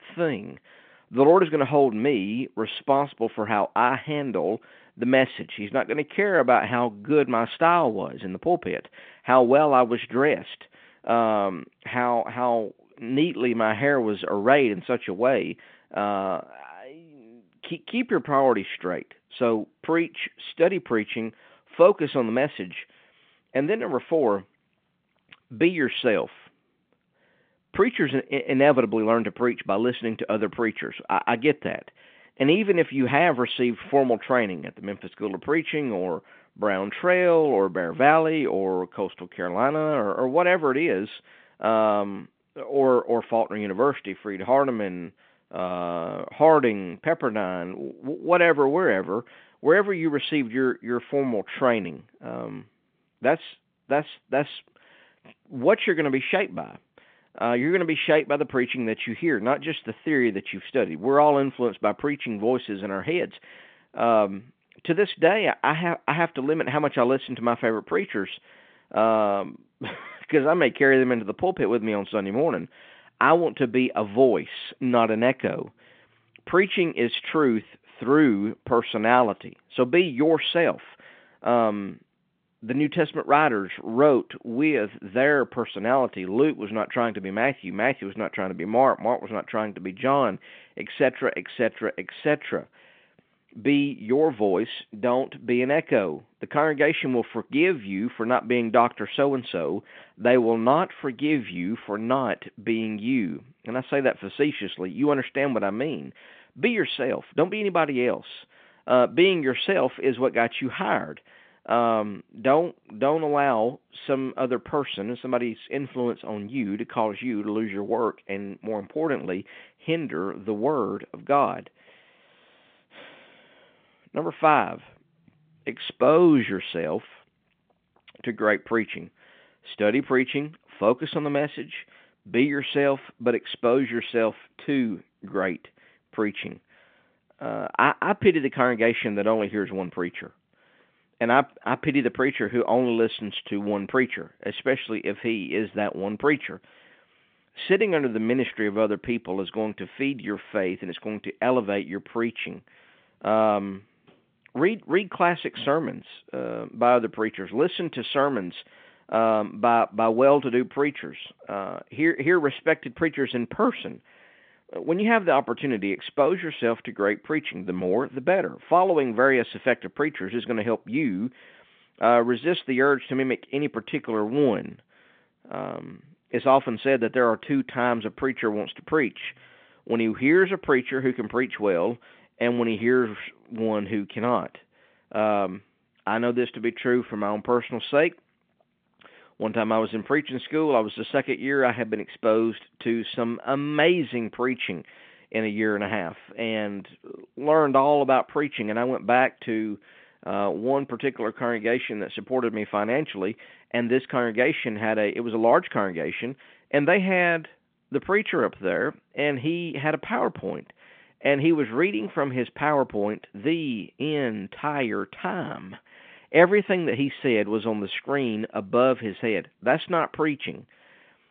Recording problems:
phone-call audio; nothing above 3.5 kHz

